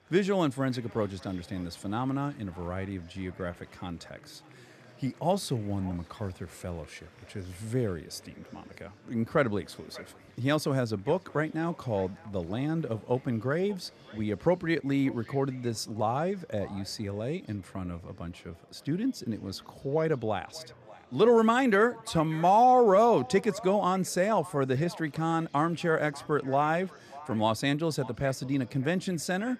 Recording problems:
echo of what is said; faint; throughout; 590 ms later, 20 dB below the speech
murmuring crowd; faint; throughout; 25 dB below the speech

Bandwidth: 14 kHz